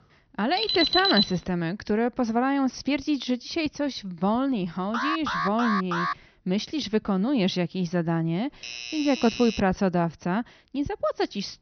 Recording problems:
high frequencies cut off; noticeable; nothing above 6 kHz
alarm; loud; at 0.5 s; peak 4 dB above the speech
alarm; noticeable; from 5 to 6 s; peak 1 dB below the speech
doorbell; noticeable; from 8.5 to 9.5 s; peak 7 dB below the speech

